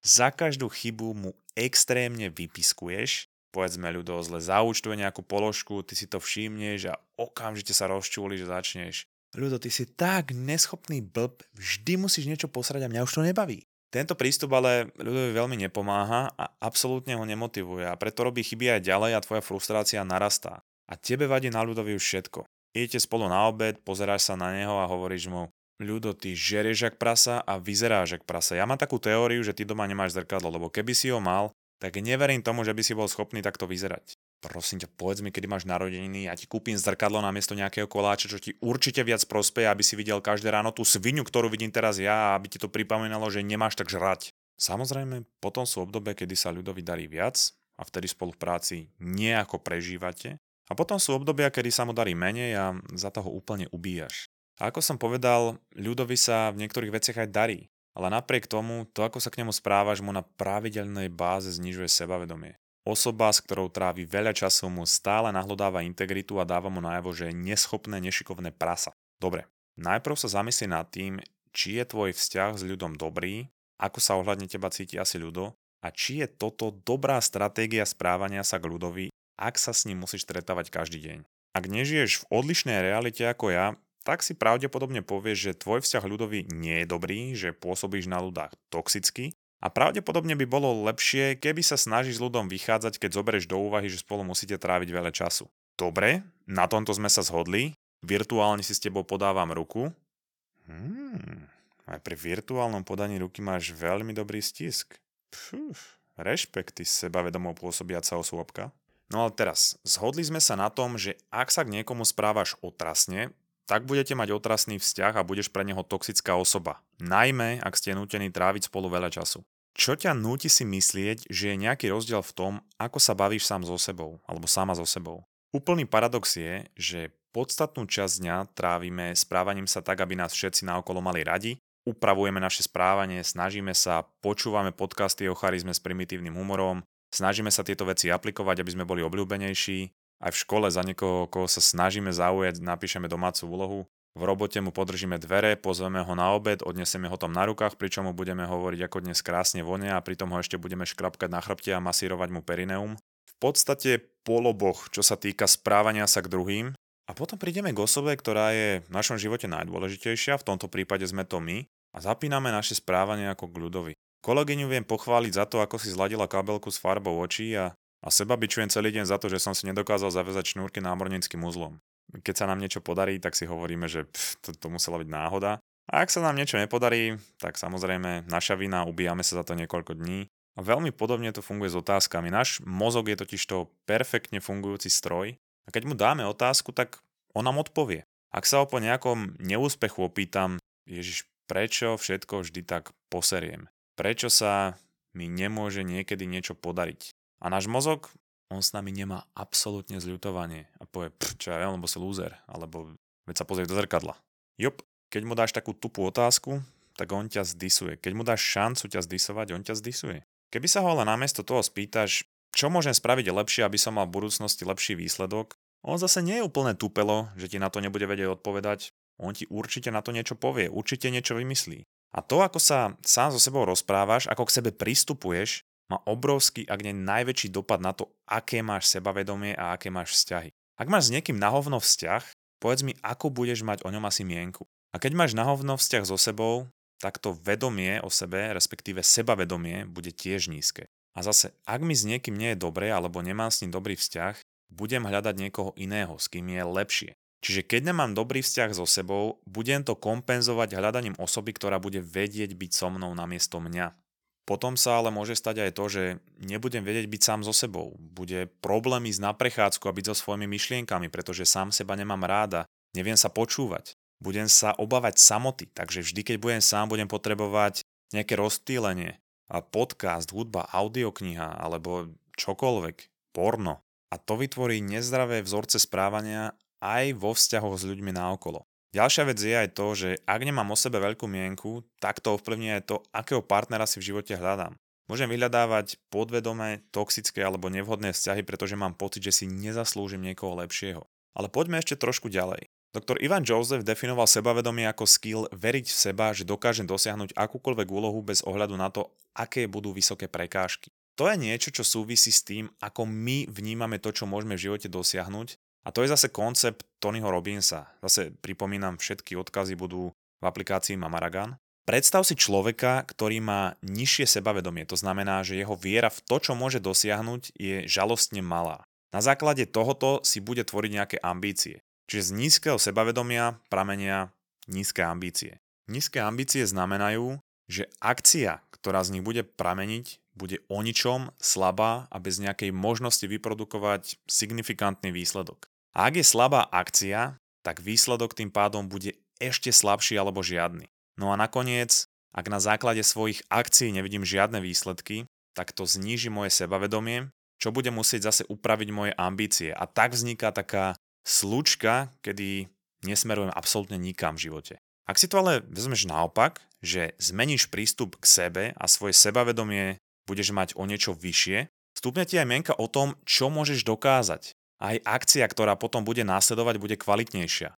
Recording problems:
thin; somewhat; fading below 1 kHz

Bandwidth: 18 kHz